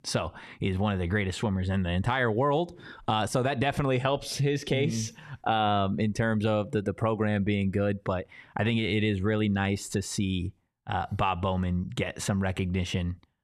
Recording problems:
none

